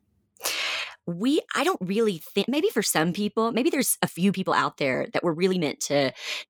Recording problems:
uneven, jittery; strongly; from 0.5 to 5.5 s

